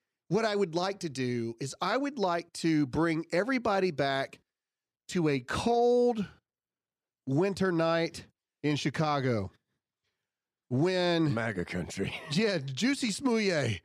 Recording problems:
none

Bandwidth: 14.5 kHz